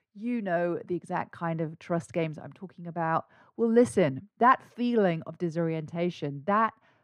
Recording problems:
muffled; very; fading above 3.5 kHz

